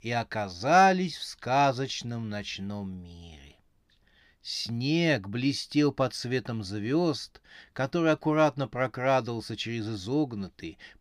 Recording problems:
none

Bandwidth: 15.5 kHz